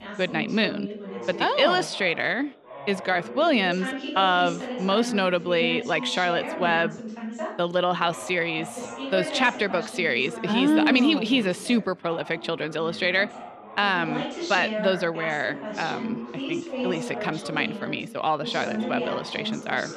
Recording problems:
background chatter; loud; throughout; 2 voices, 9 dB below the speech

